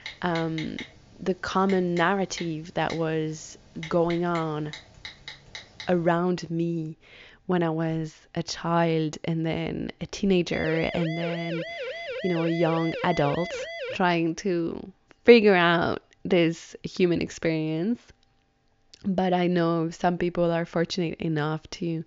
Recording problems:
high frequencies cut off; noticeable; nothing above 7 kHz
keyboard typing; faint; until 6 s; peak 10 dB below the speech
siren; noticeable; from 11 to 14 s; peak 7 dB below the speech

